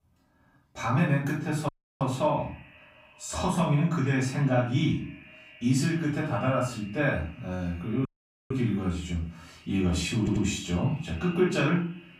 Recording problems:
off-mic speech; far
room echo; noticeable; dies away in 0.4 s
echo of what is said; faint; throughout; 220 ms later, 25 dB below the speech
audio cutting out; at 1.5 s and at 8 s
audio stuttering; at 10 s

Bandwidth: 15.5 kHz